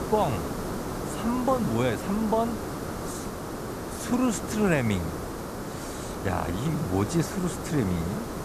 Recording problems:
hiss; loud; throughout; 6 dB below the speech

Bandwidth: 14.5 kHz